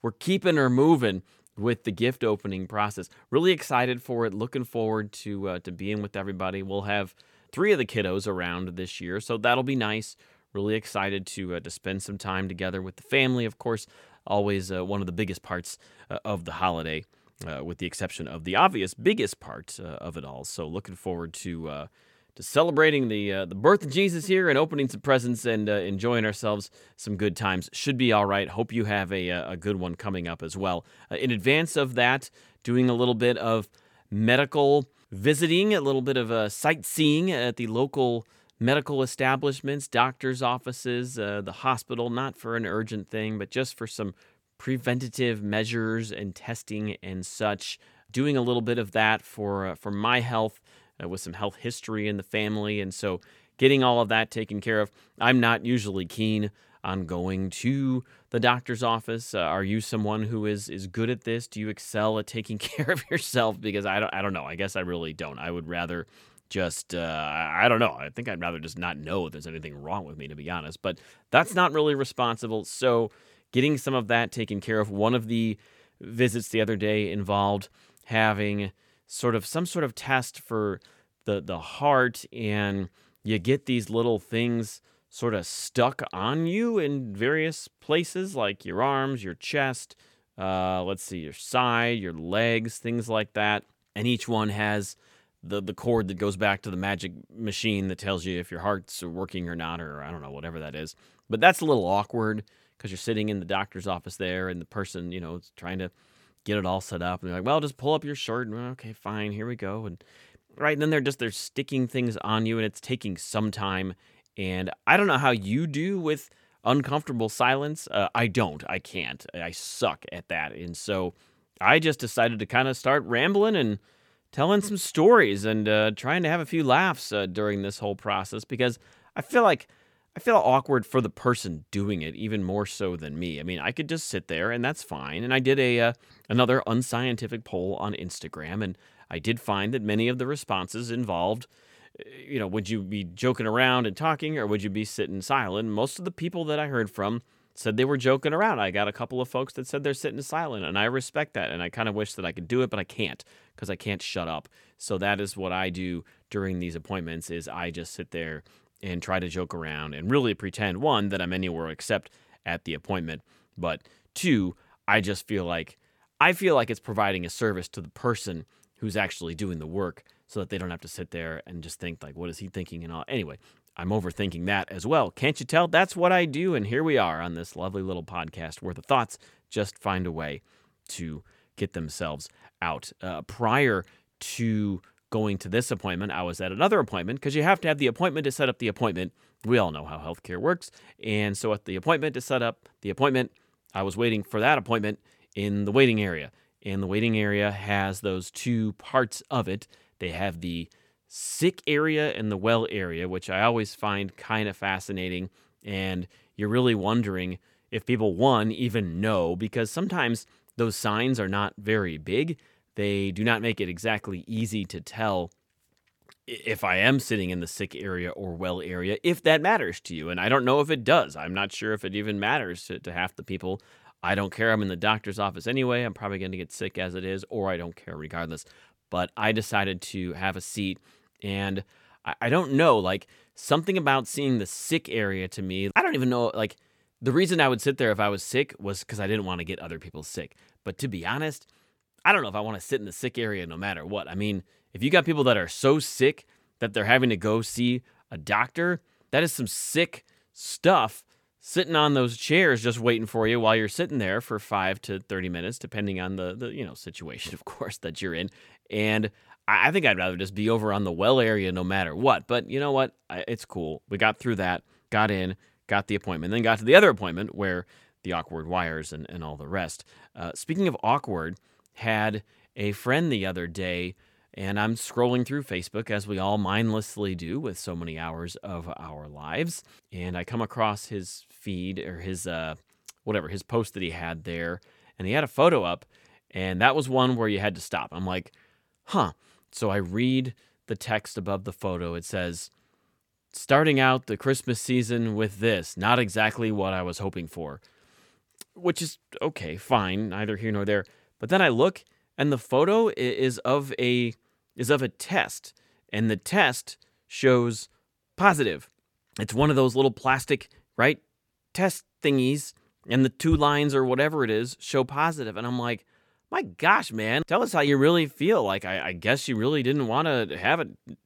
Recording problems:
none

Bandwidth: 17 kHz